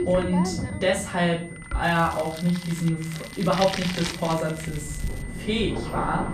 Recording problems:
off-mic speech; far
room echo; slight; dies away in 0.4 s
household noises; loud; throughout; 9 dB below the speech
high-pitched whine; noticeable; throughout; 2 kHz, 20 dB below the speech
rain or running water; noticeable; throughout; 15 dB below the speech
crackling; faint; from 2 to 3 s and from 3 to 5 s; 20 dB below the speech

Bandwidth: 14.5 kHz